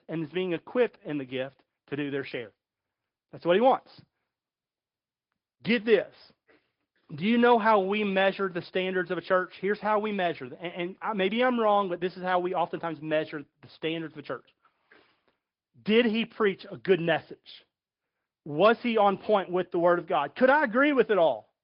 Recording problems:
high frequencies cut off; noticeable; nothing above 5 kHz
garbled, watery; slightly

